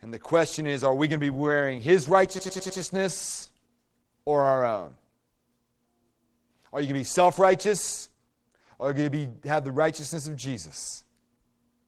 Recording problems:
garbled, watery; slightly
audio stuttering; at 2.5 s

